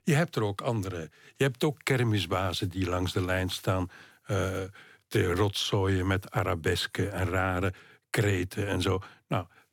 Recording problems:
none

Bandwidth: 17.5 kHz